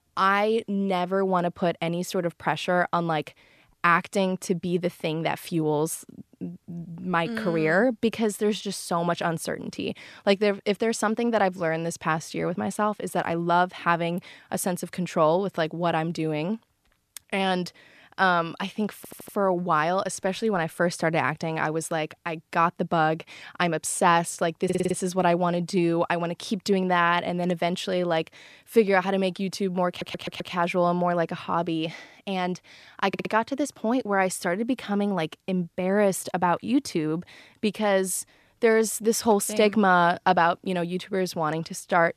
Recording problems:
audio stuttering; 4 times, first at 19 s

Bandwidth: 14 kHz